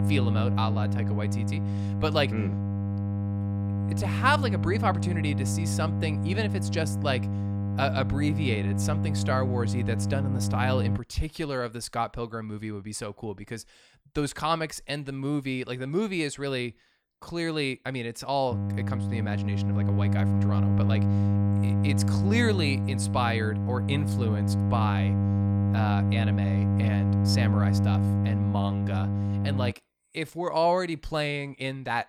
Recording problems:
electrical hum; loud; until 11 s and from 19 to 30 s; 50 Hz, 6 dB below the speech

